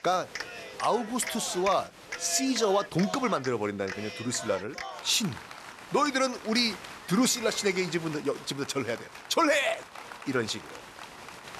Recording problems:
crowd noise; noticeable; throughout; 10 dB below the speech

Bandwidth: 13.5 kHz